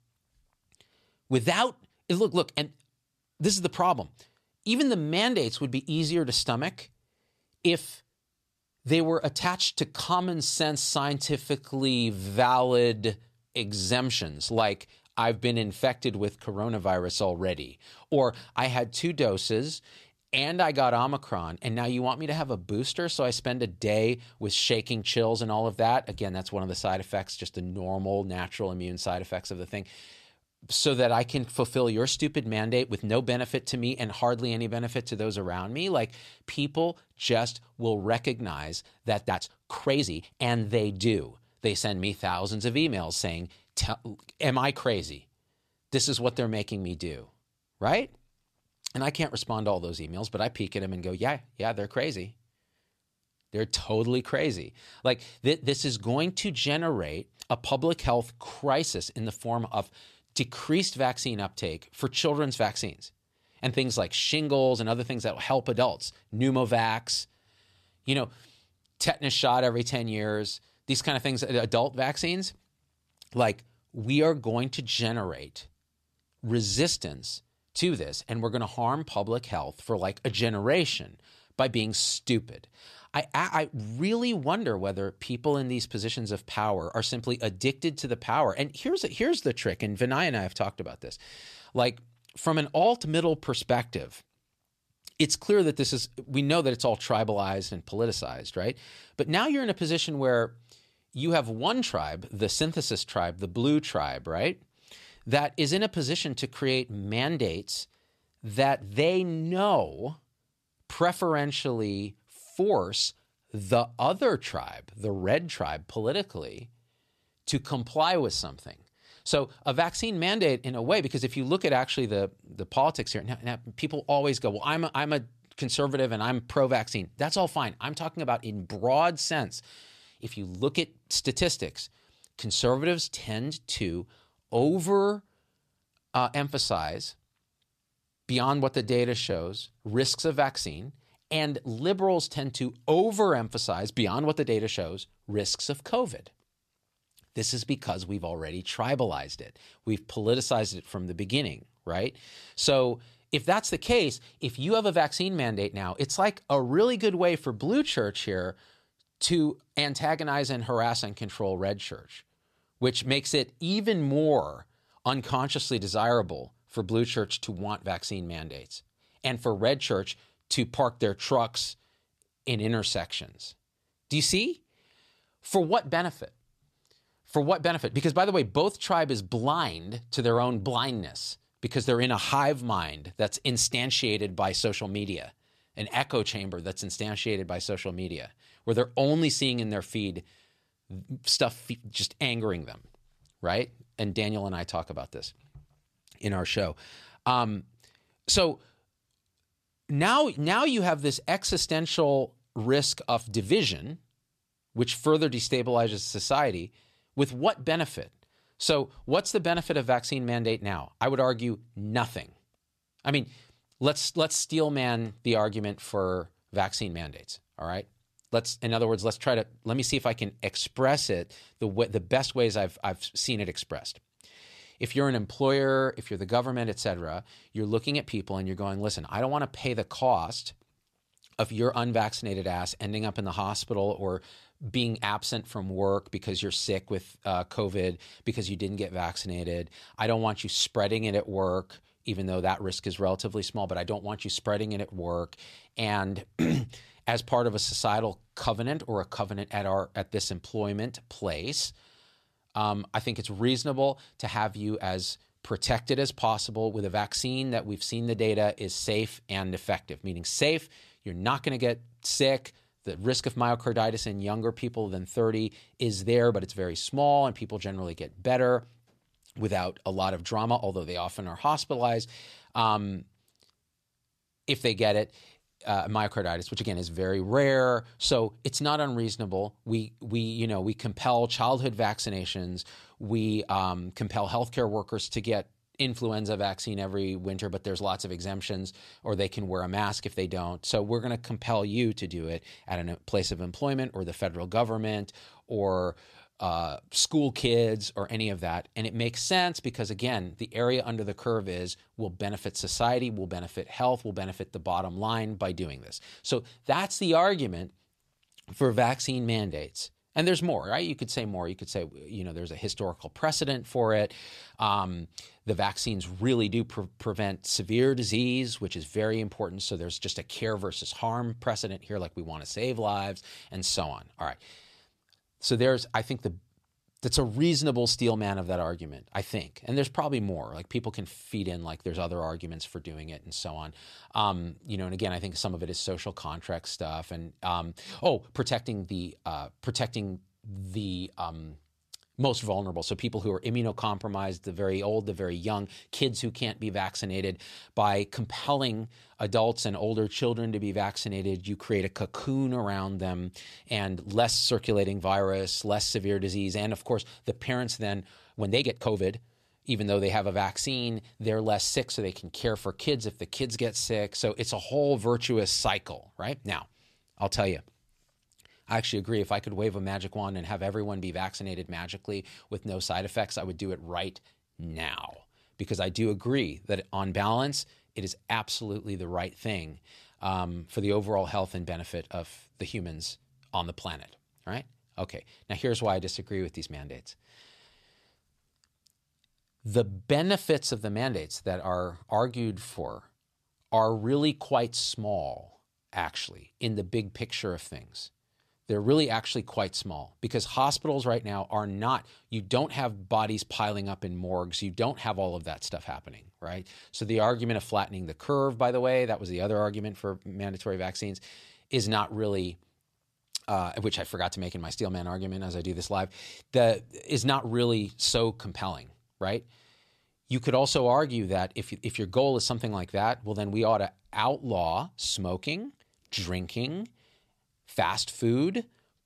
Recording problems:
uneven, jittery; strongly; from 20 s to 6:52

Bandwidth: 14 kHz